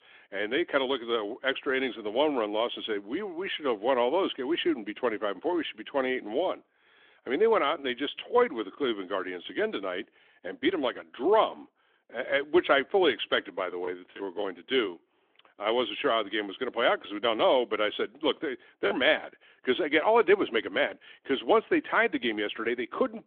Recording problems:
phone-call audio; nothing above 3.5 kHz

